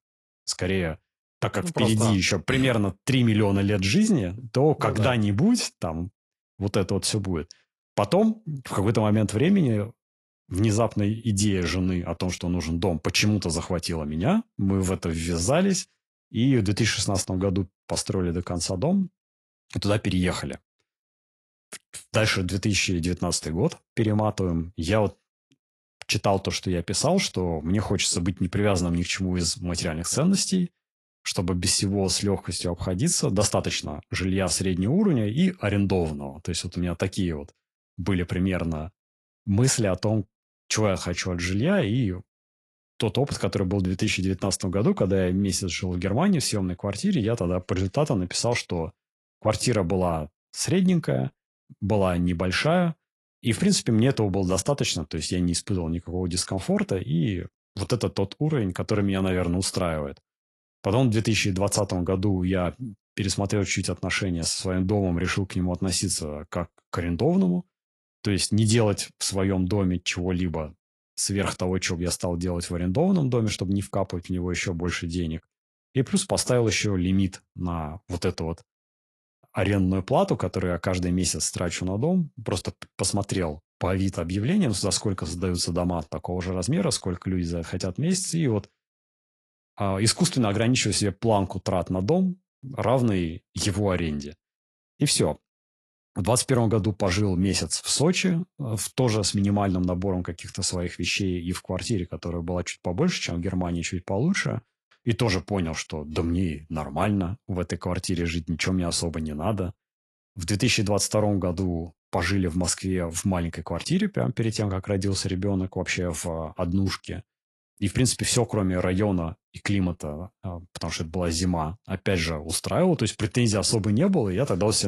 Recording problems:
garbled, watery; slightly; nothing above 11 kHz
abrupt cut into speech; at the end

